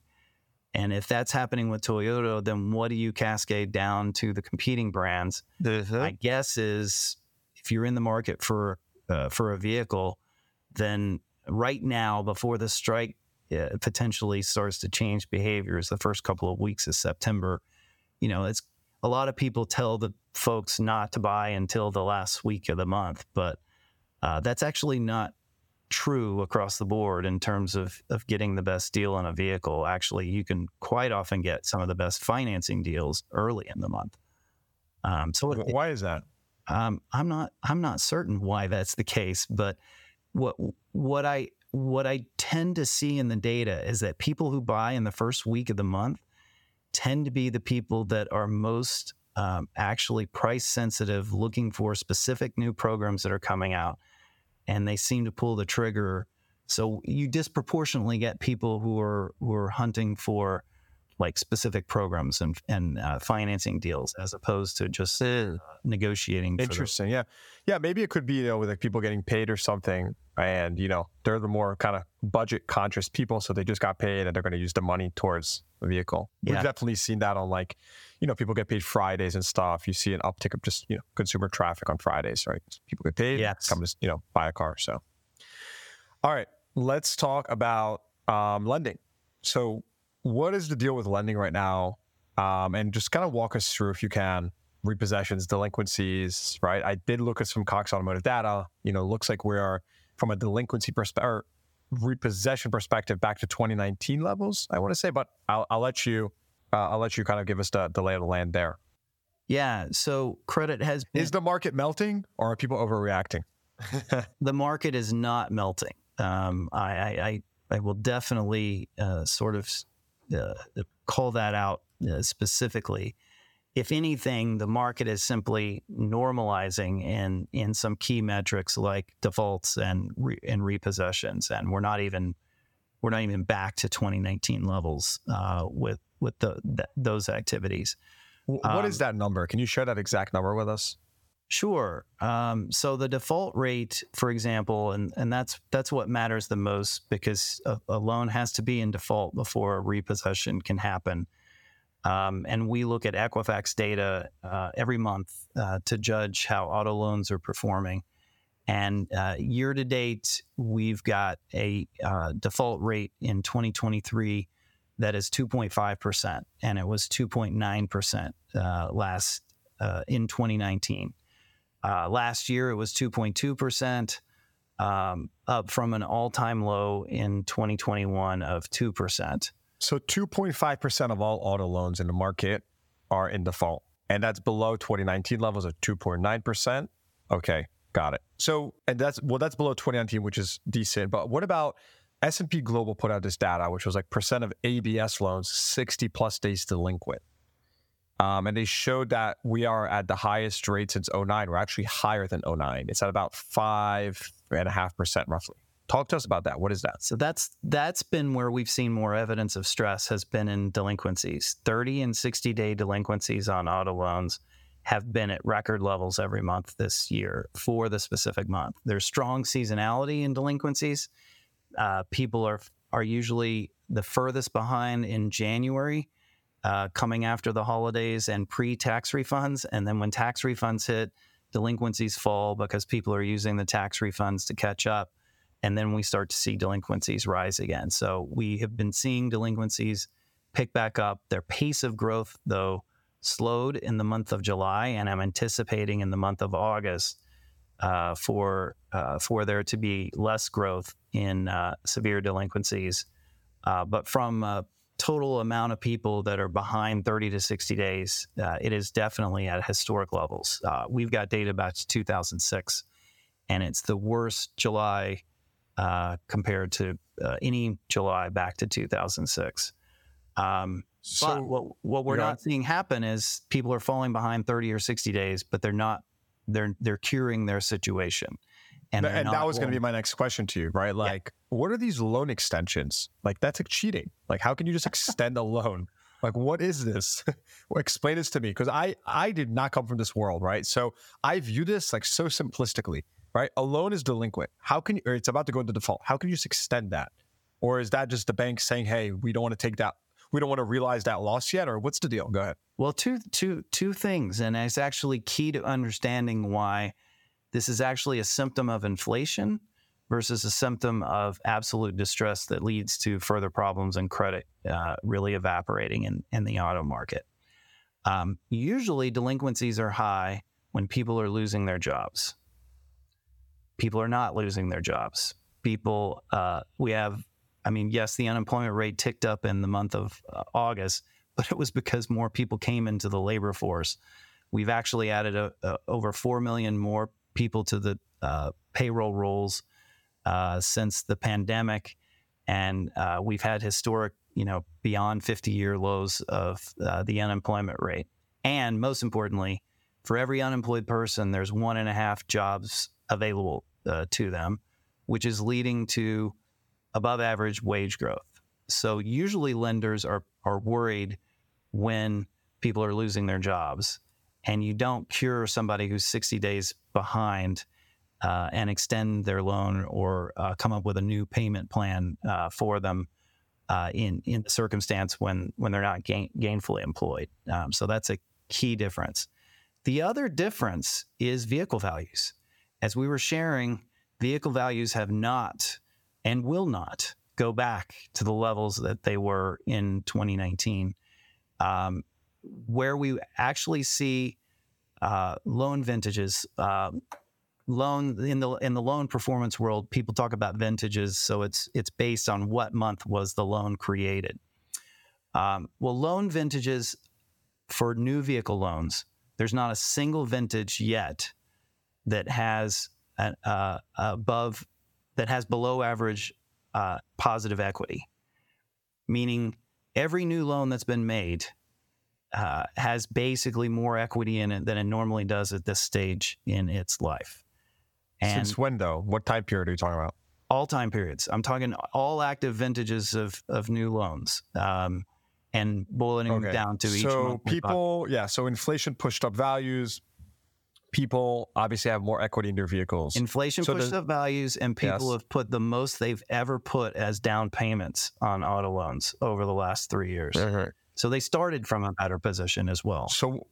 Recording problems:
squashed, flat; somewhat

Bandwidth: 18 kHz